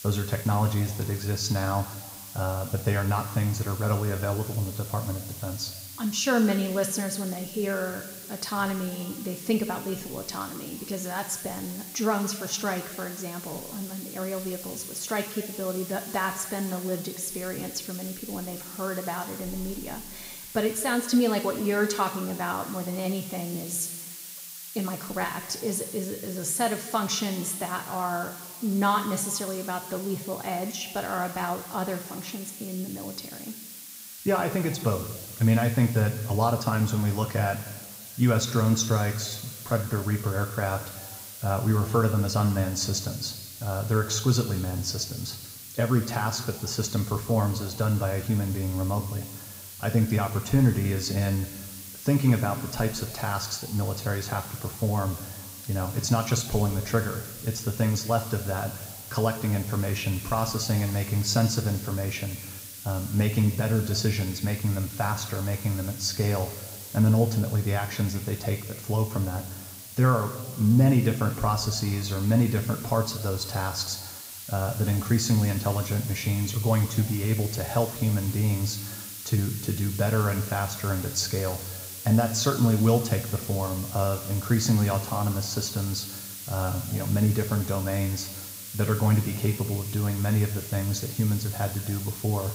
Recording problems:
room echo; slight; dies away in 1.3 s
off-mic speech; somewhat distant
hiss; noticeable; throughout; 10 dB below the speech

